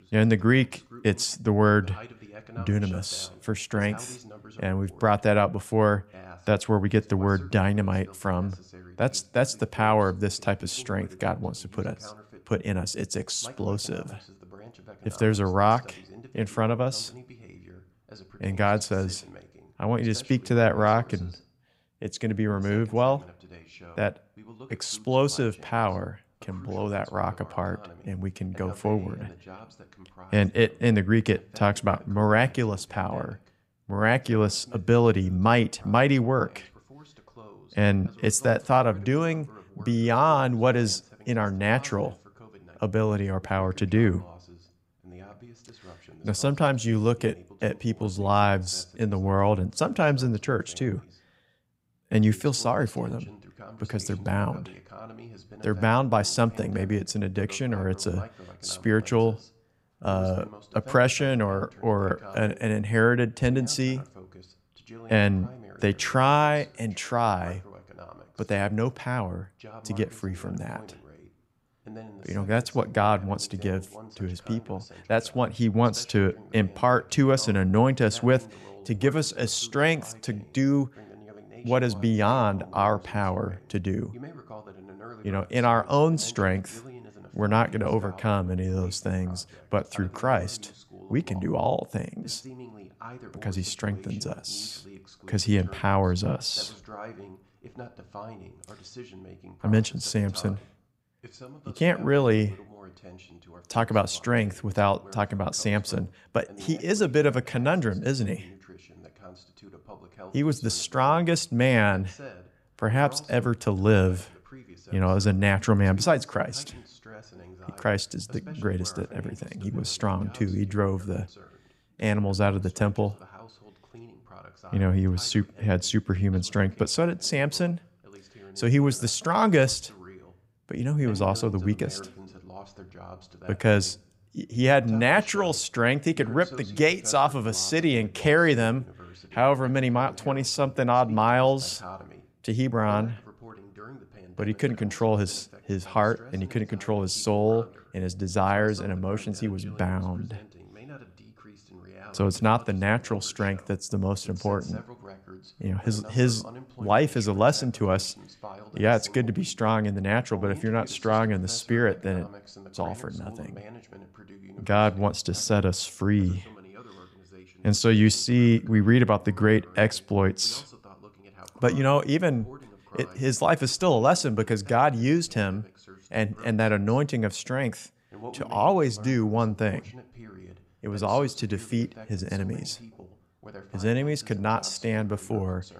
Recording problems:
voice in the background; faint; throughout; 20 dB below the speech

